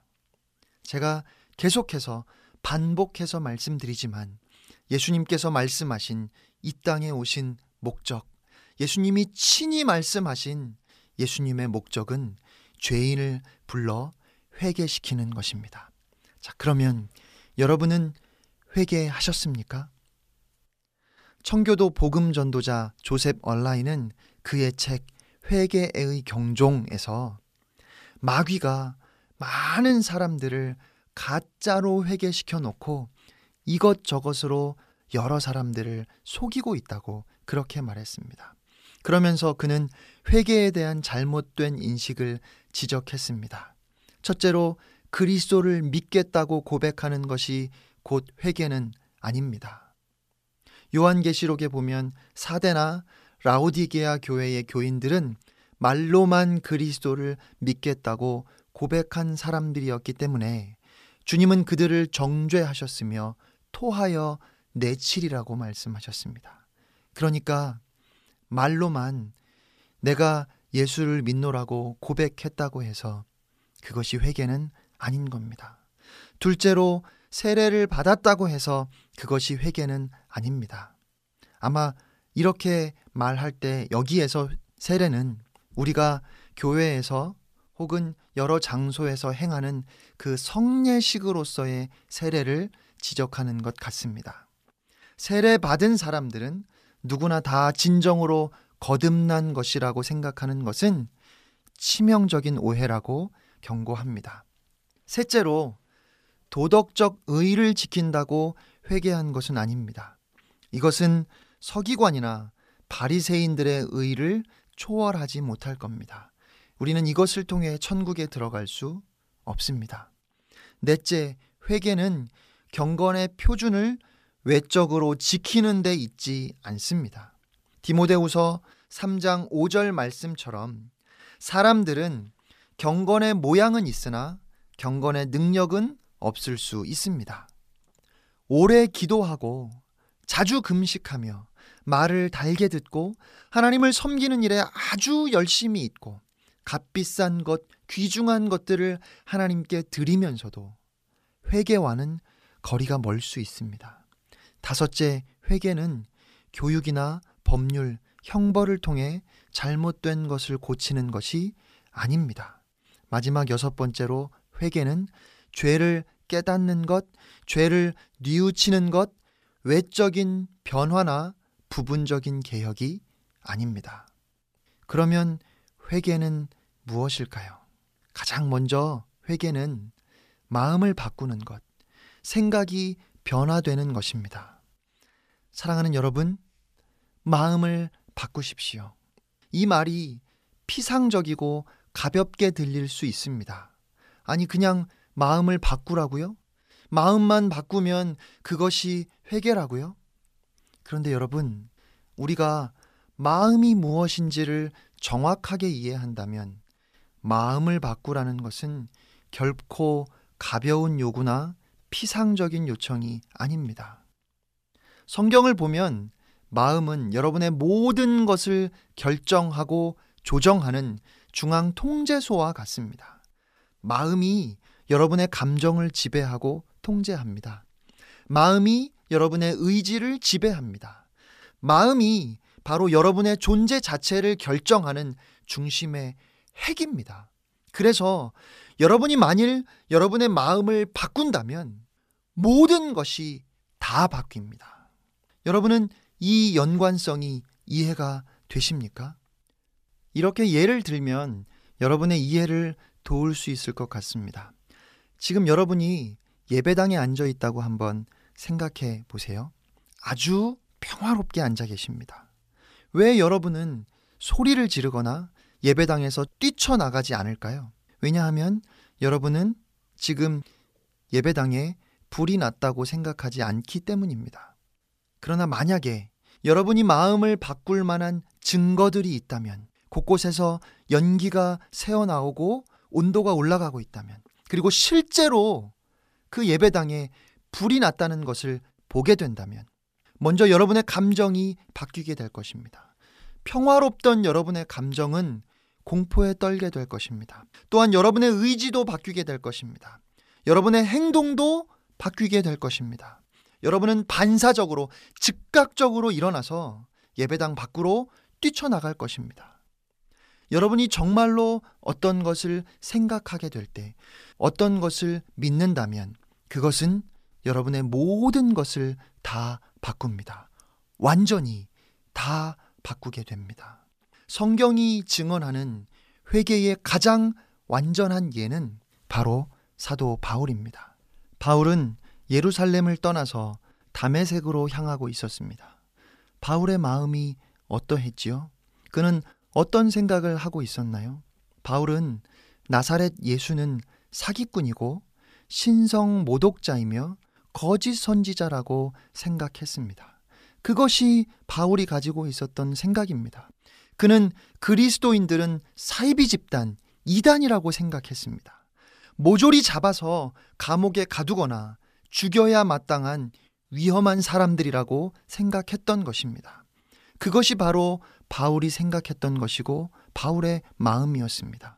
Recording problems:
none

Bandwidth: 14.5 kHz